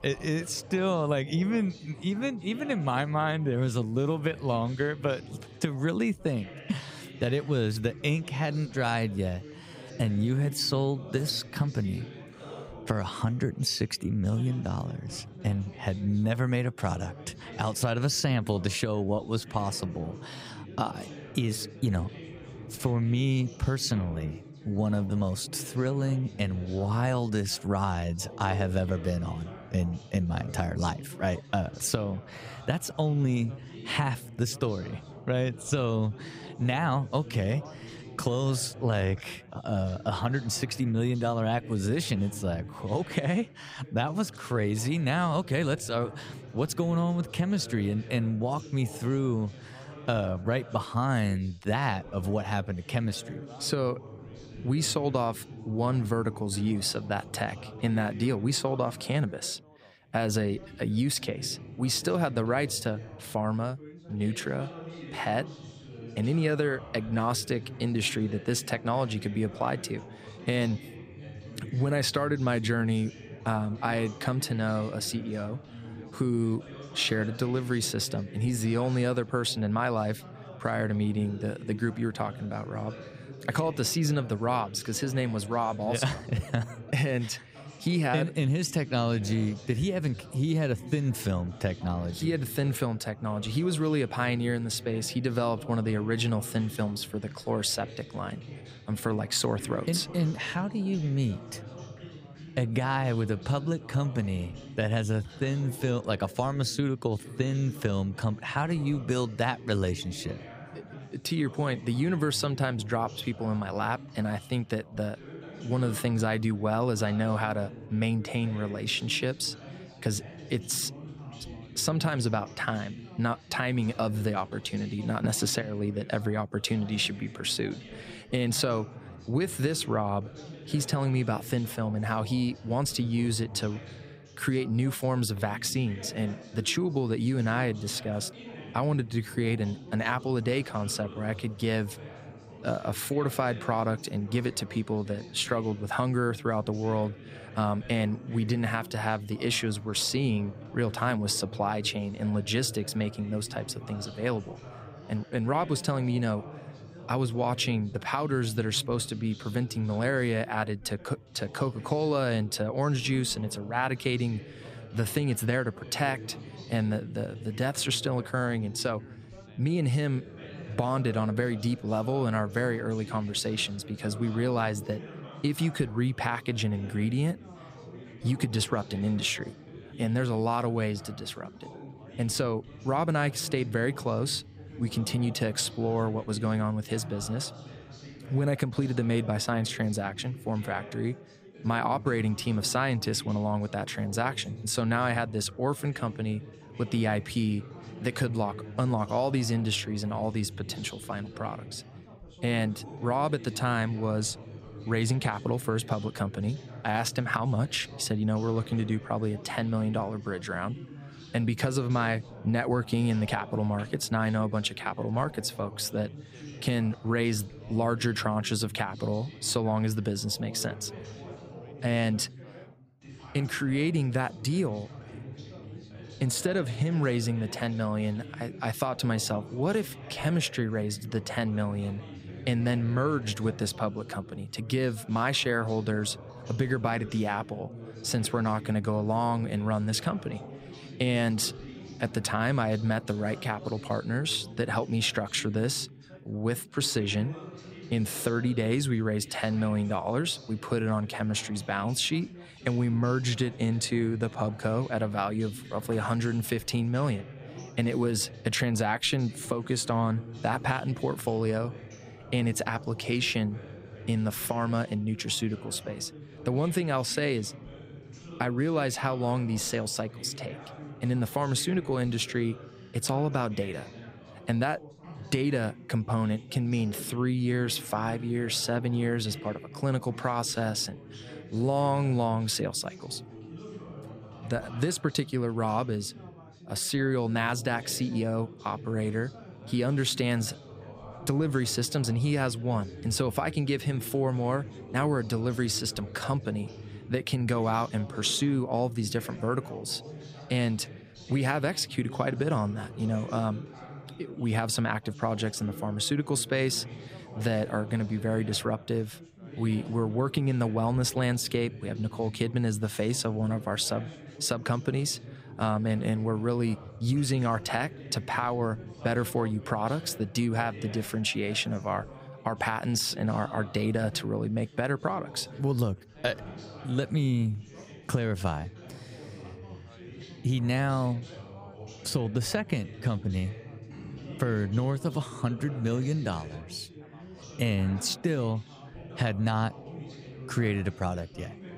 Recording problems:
background chatter; noticeable; throughout; 3 voices, 15 dB below the speech

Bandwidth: 15.5 kHz